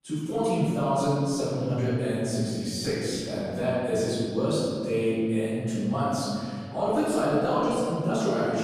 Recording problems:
room echo; strong; dies away in 2.5 s
off-mic speech; far

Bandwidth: 14.5 kHz